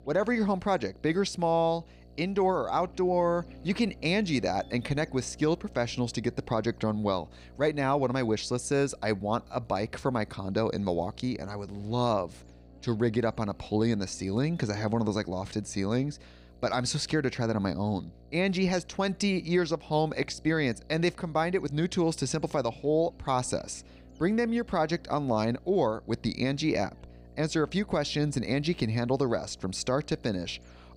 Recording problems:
electrical hum; faint; throughout; 60 Hz, 30 dB below the speech

